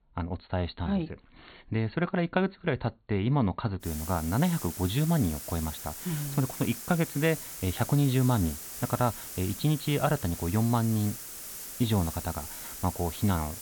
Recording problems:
high frequencies cut off; severe; nothing above 4.5 kHz
hiss; loud; from 4 s on; 9 dB below the speech

